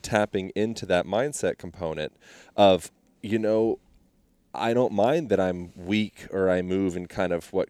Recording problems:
none

